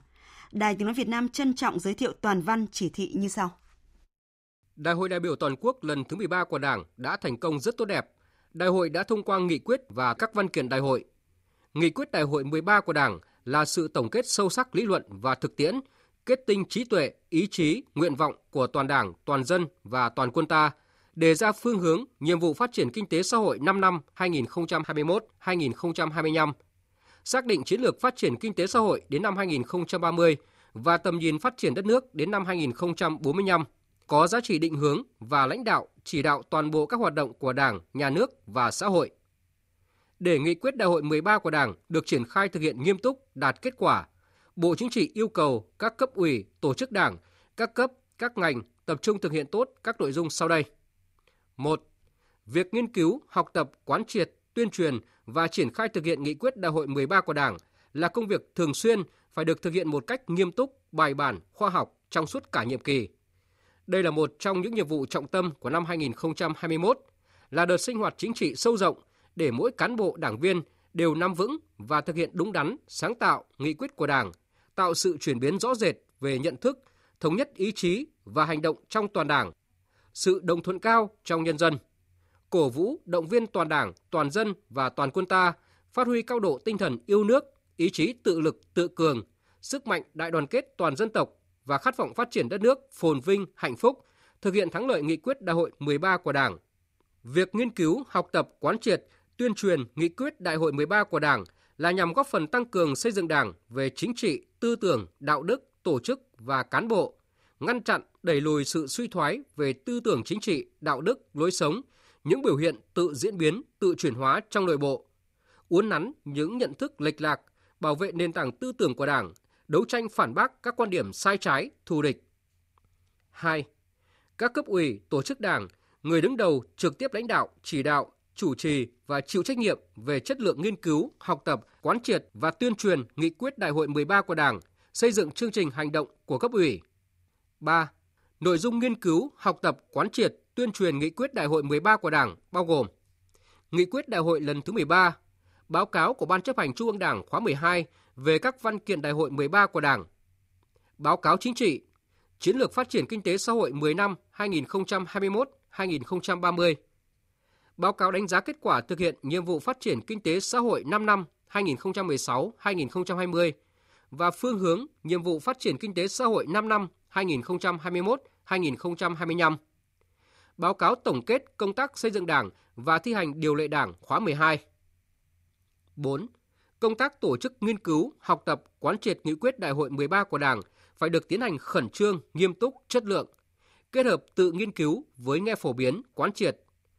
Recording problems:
none

